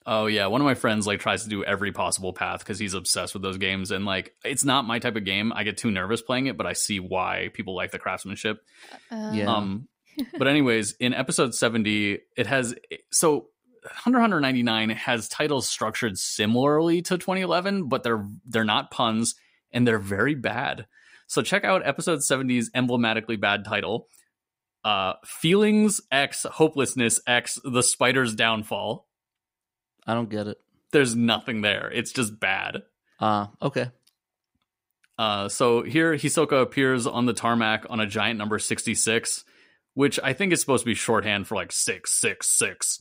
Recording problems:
none

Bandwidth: 15.5 kHz